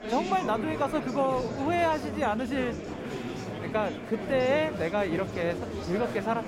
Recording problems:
chatter from many people; loud; throughout; 6 dB below the speech

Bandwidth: 16 kHz